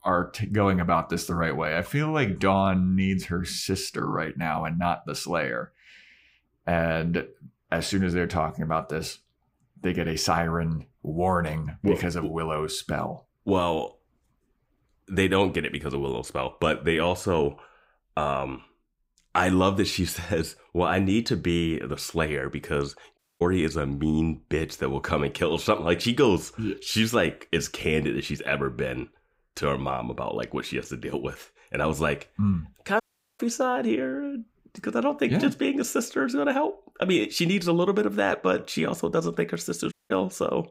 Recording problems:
audio cutting out; at 23 s, at 33 s and at 40 s

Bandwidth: 15.5 kHz